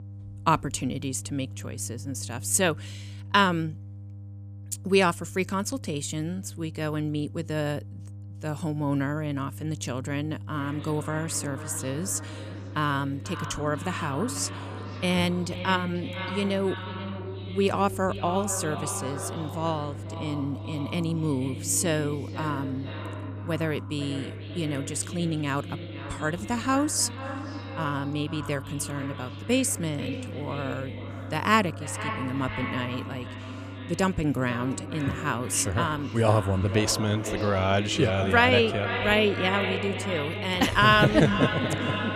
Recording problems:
echo of what is said; strong; from 10 s on; 490 ms later, 9 dB below the speech
electrical hum; faint; throughout; 50 Hz, 25 dB below the speech

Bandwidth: 14.5 kHz